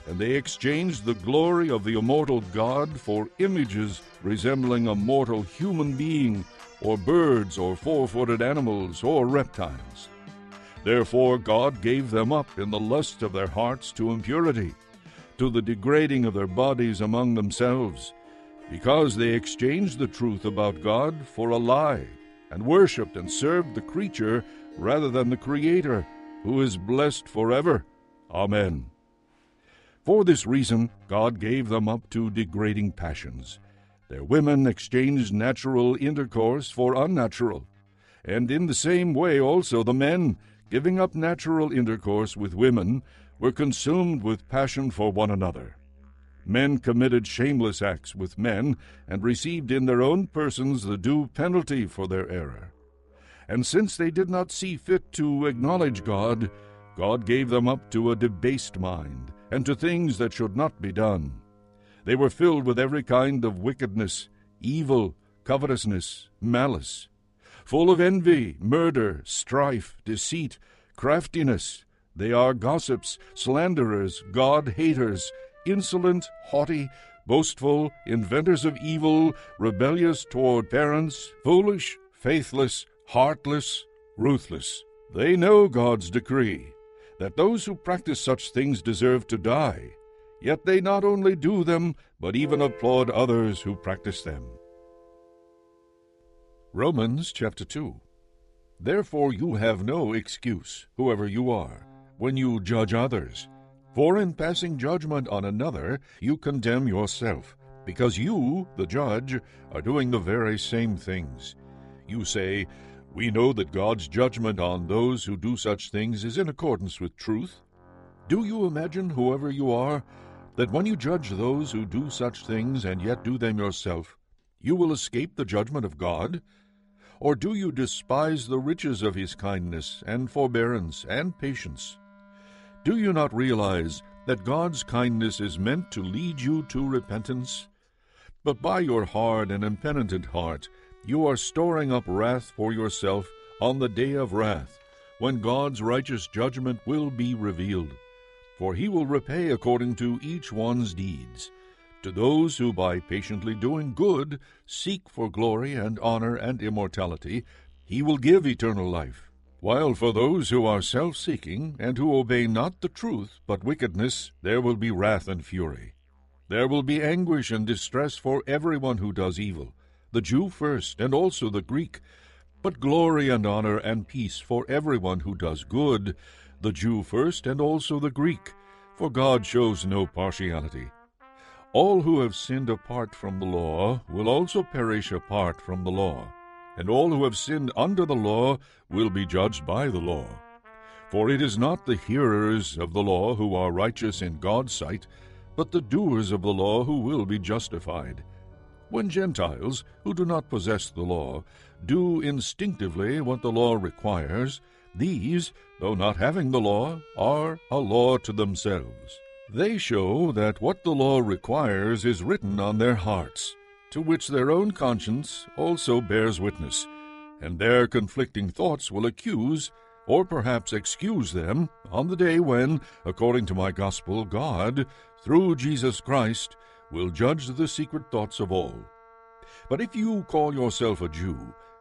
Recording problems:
background music; faint; throughout; 25 dB below the speech

